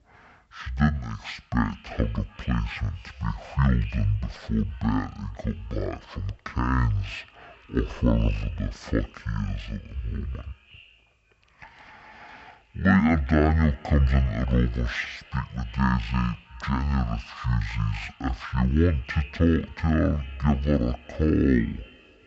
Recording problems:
wrong speed and pitch; too slow and too low; 0.5 times normal speed
echo of what is said; faint; throughout; 360 ms later, 25 dB below the speech

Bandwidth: 8 kHz